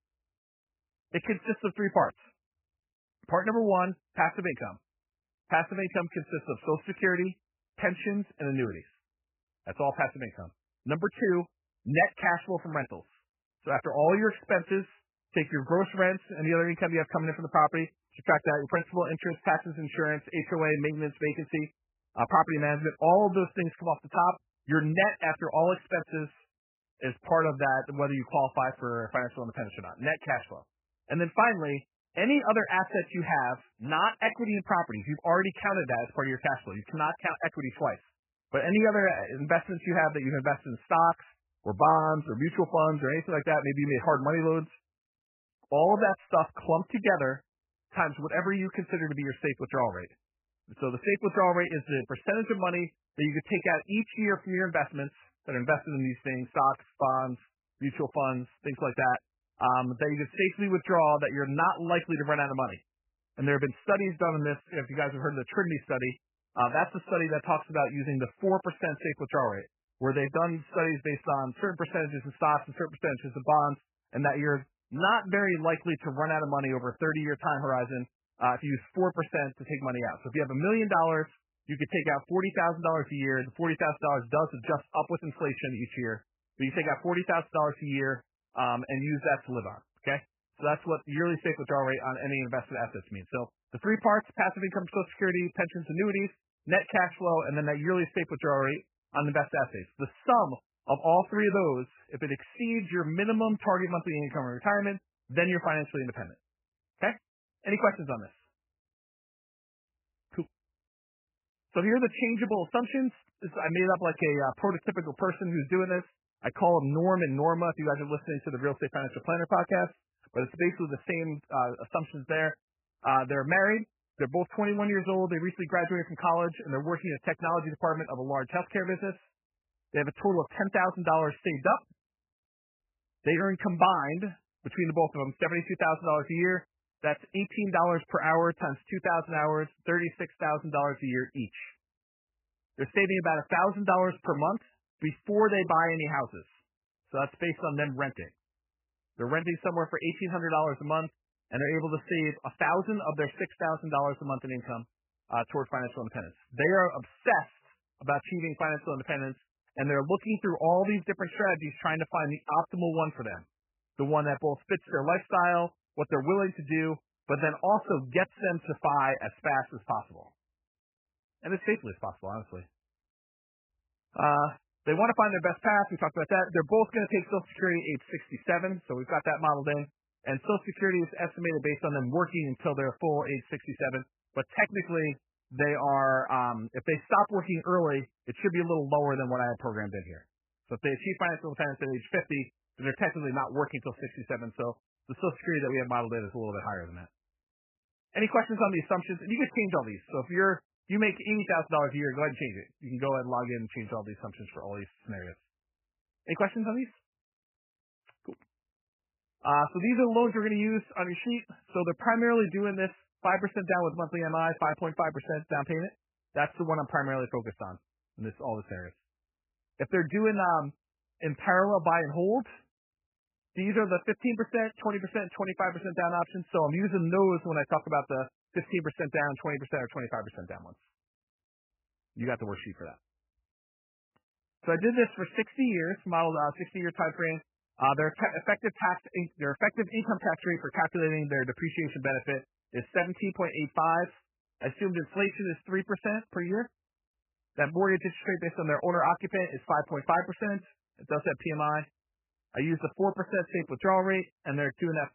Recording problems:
garbled, watery; badly; nothing above 3 kHz

